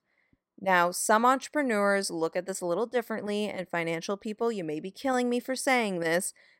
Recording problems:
none

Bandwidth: 16 kHz